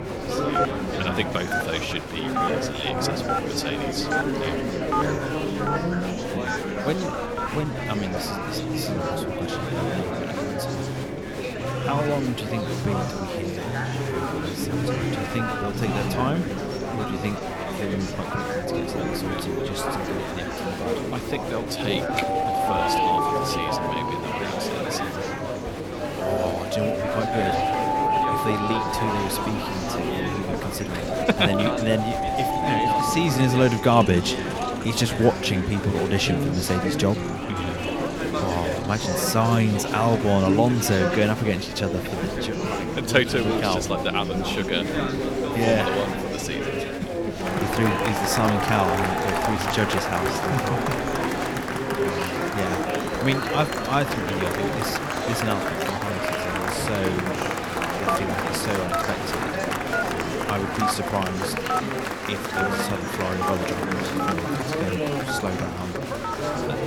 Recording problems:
alarms or sirens; loud; throughout; 2 dB below the speech
chatter from many people; loud; throughout; as loud as the speech
low rumble; noticeable; throughout; 15 dB below the speech
electrical hum; faint; throughout; 50 Hz, 25 dB below the speech
uneven, jittery; strongly; from 2.5 s to 1:05

